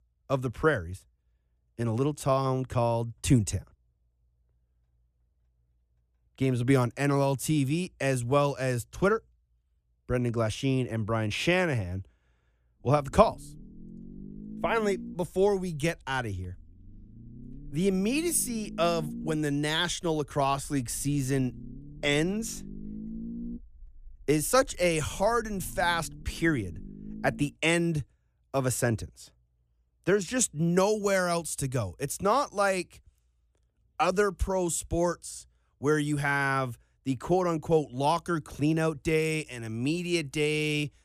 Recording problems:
low rumble; faint; from 13 to 27 s; 20 dB below the speech

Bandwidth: 14.5 kHz